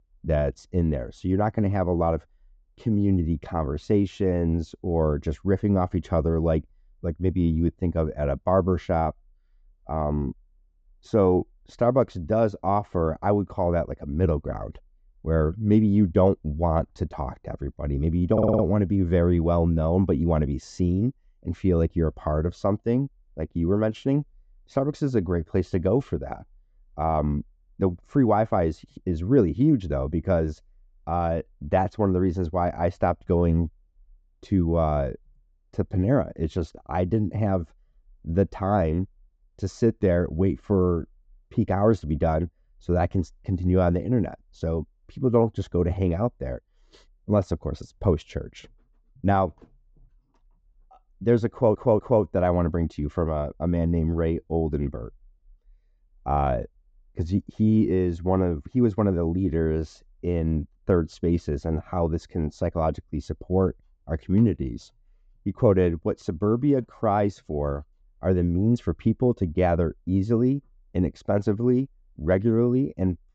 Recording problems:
muffled; slightly; fading above 1 kHz
high frequencies cut off; noticeable; nothing above 8 kHz
audio stuttering; at 18 s and at 52 s

